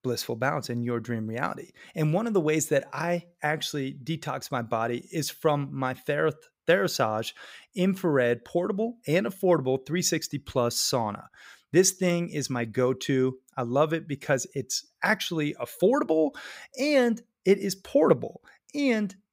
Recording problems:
none

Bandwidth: 15.5 kHz